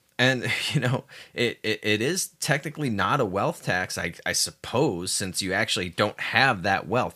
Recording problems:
none

